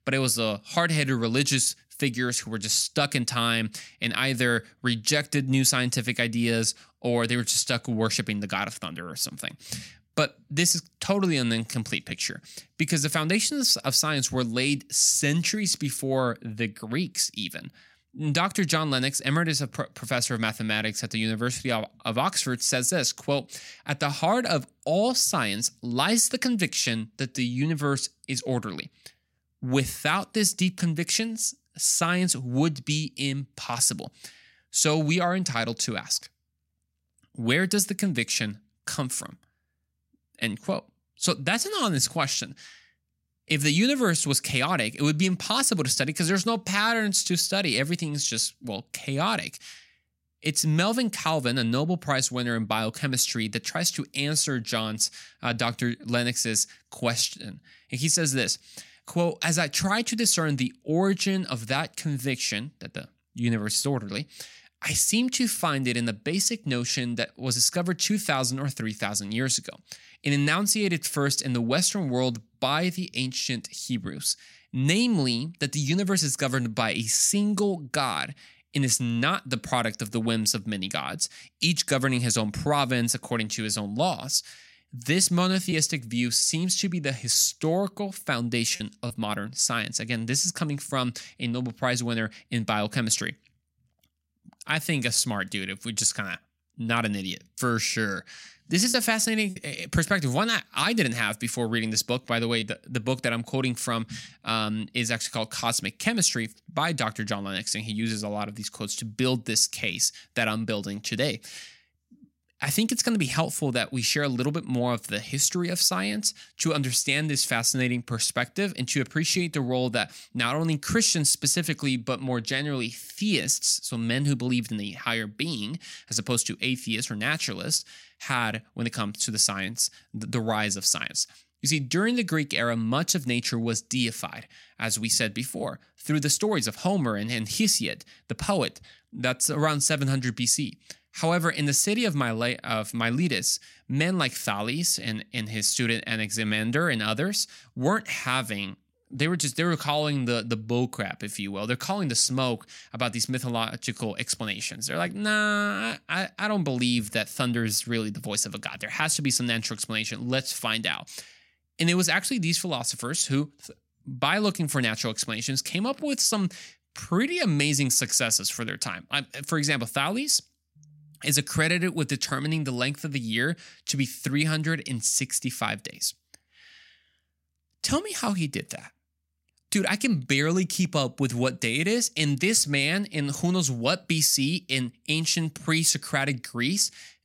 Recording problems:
choppy; occasionally; from 1:26 to 1:29 and from 1:39 to 1:43; 3% of the speech affected

